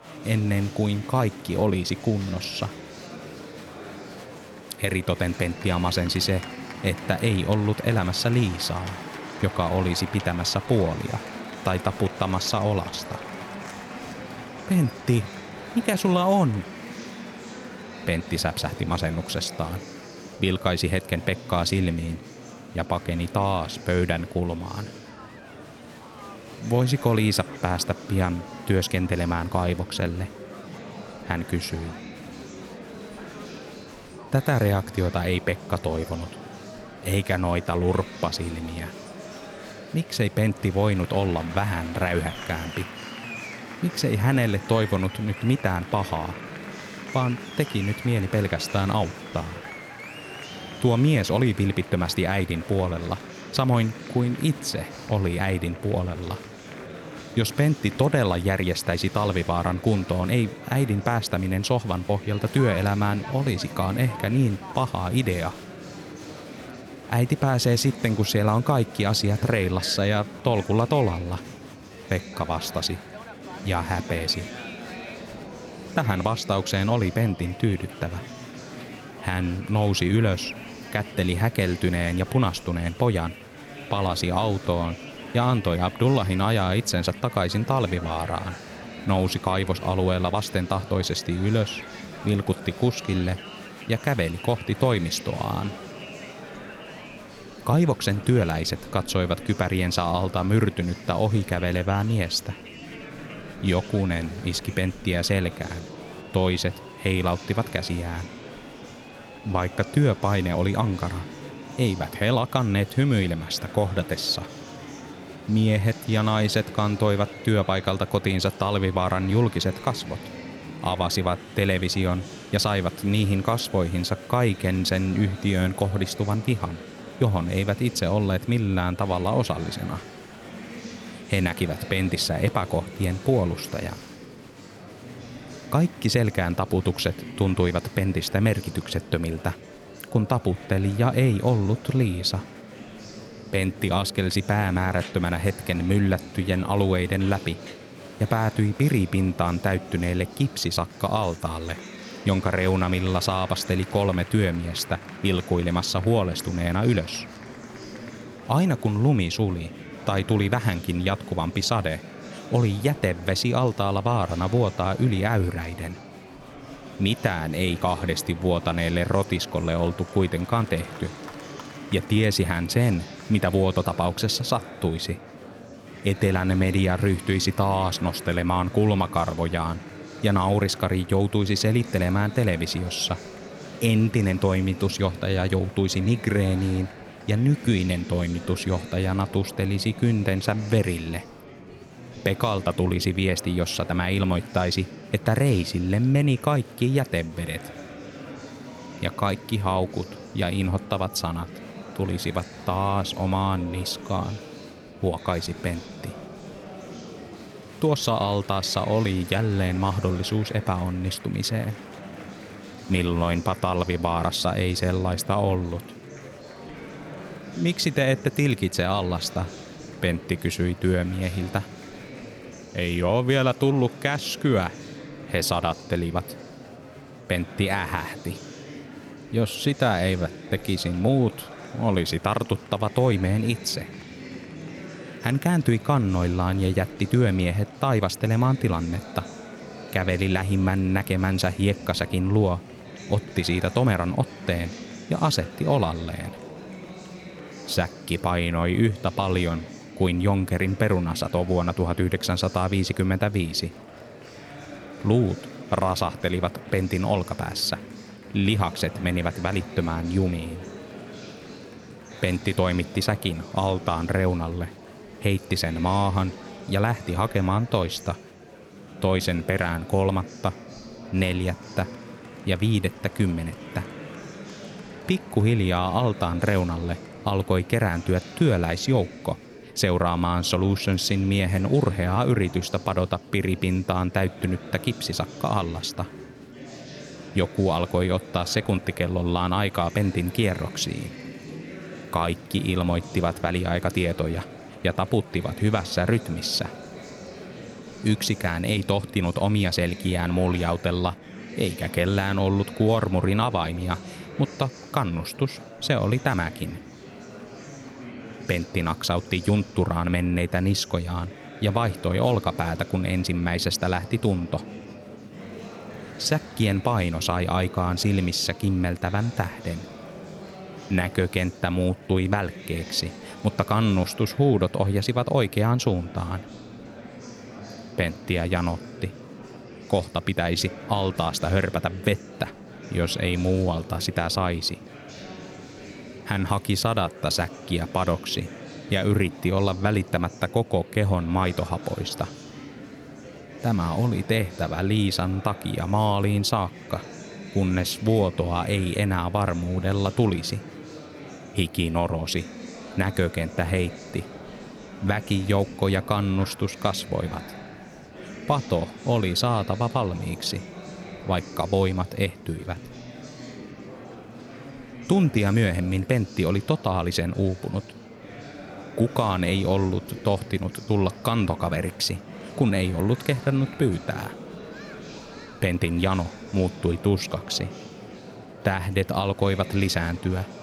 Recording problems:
murmuring crowd; noticeable; throughout; 15 dB below the speech

